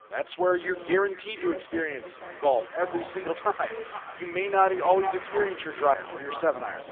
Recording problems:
phone-call audio; poor line; nothing above 3.5 kHz
echo of what is said; noticeable; throughout; 470 ms later, 15 dB below the speech
traffic noise; noticeable; throughout; 20 dB below the speech
background chatter; noticeable; throughout; 4 voices, 15 dB below the speech

